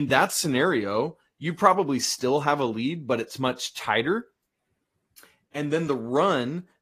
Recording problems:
garbled, watery; slightly; nothing above 15 kHz
abrupt cut into speech; at the start

